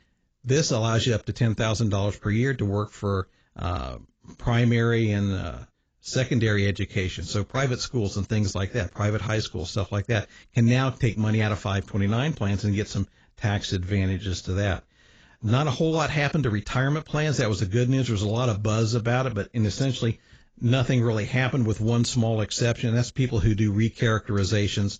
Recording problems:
garbled, watery; badly; nothing above 7.5 kHz

